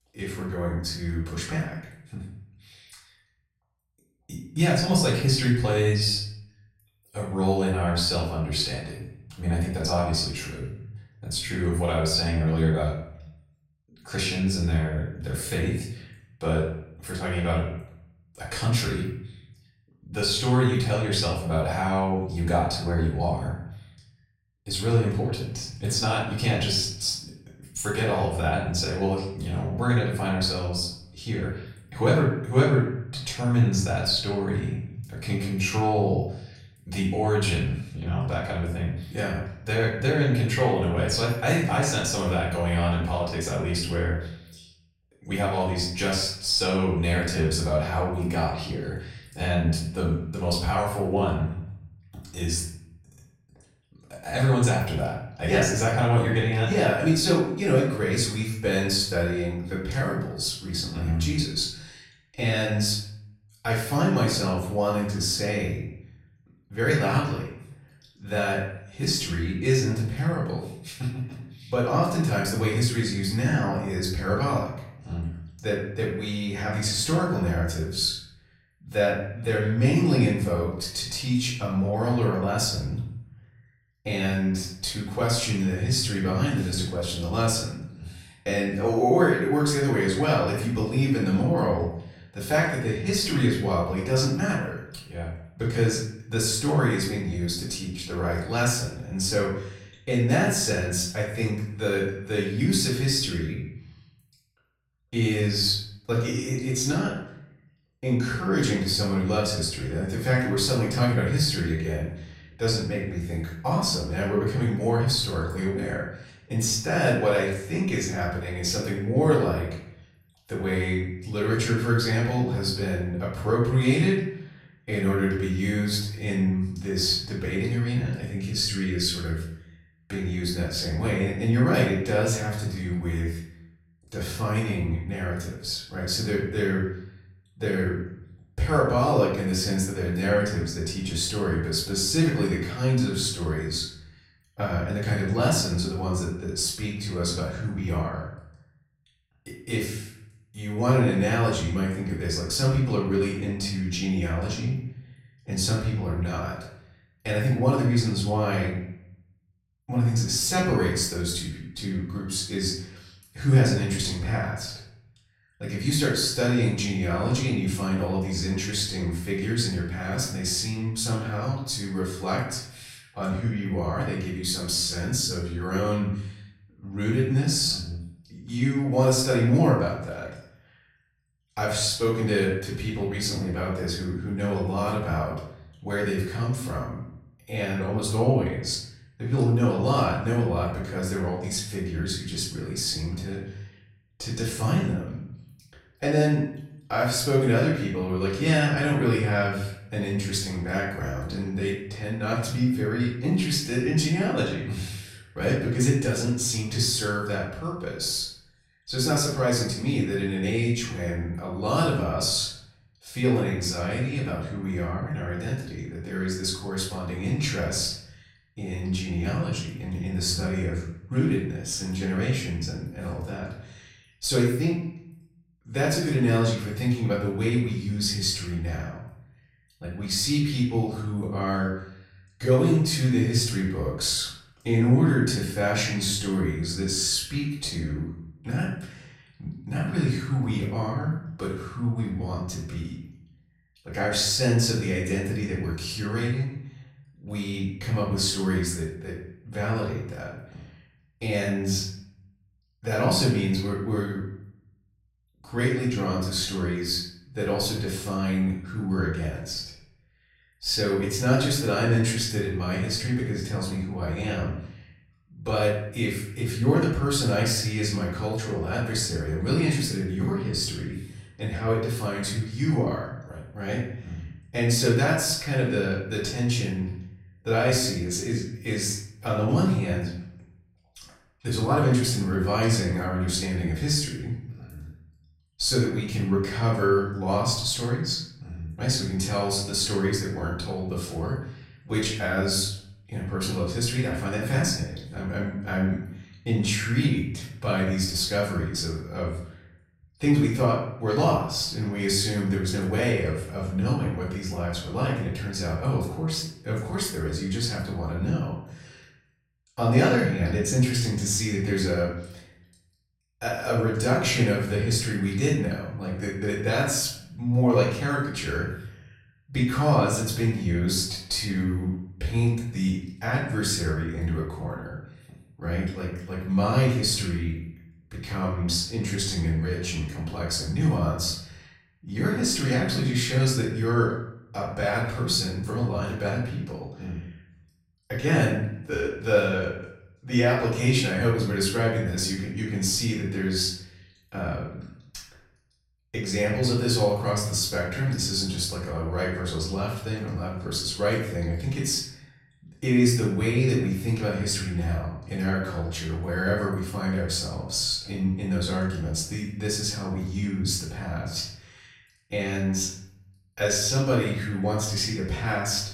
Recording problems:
off-mic speech; far
room echo; noticeable; dies away in 0.6 s

